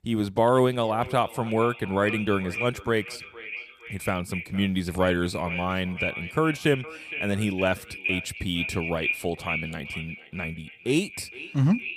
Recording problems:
echo of what is said; strong; throughout; 460 ms later, 7 dB below the speech

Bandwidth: 15 kHz